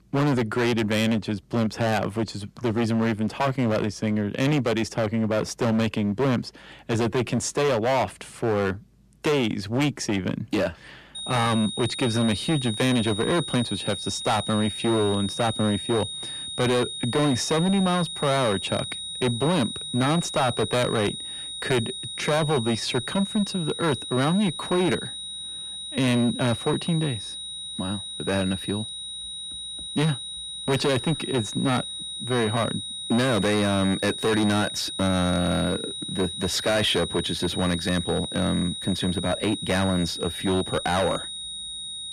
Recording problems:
distortion; heavy; 15% of the sound clipped
high-pitched whine; loud; from 11 s on; 3.5 kHz, 6 dB below the speech

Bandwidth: 14.5 kHz